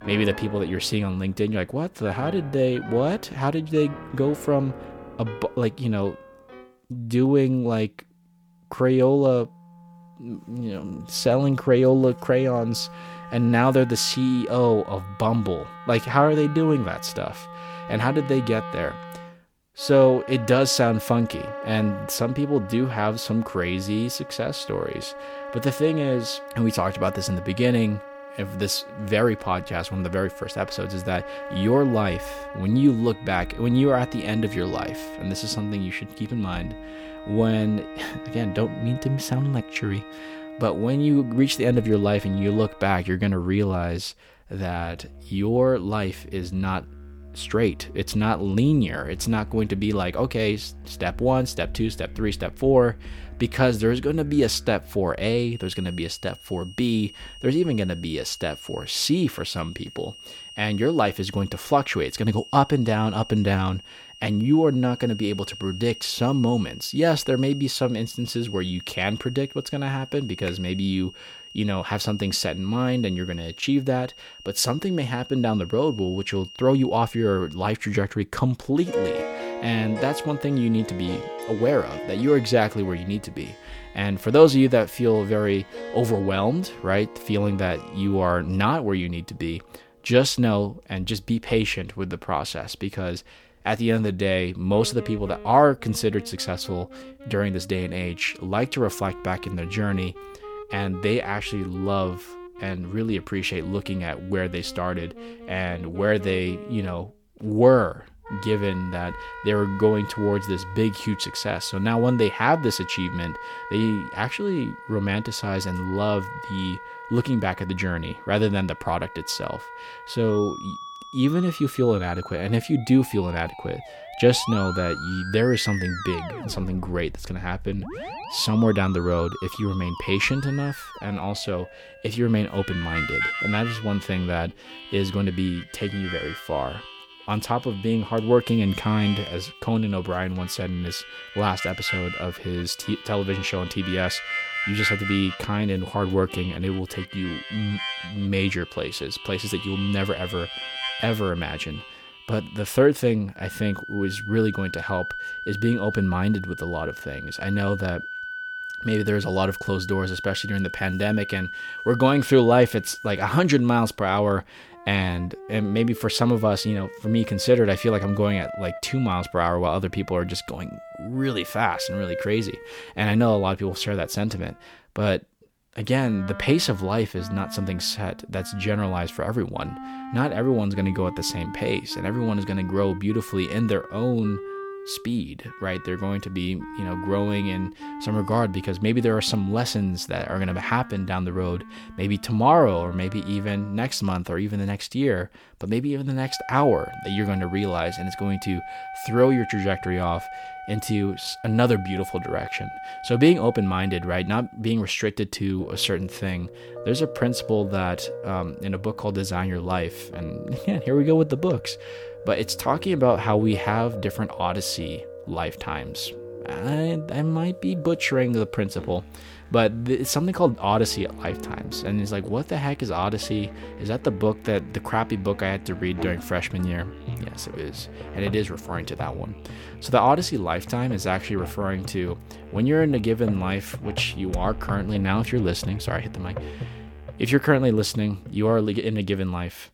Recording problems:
background music; noticeable; throughout; 10 dB below the speech

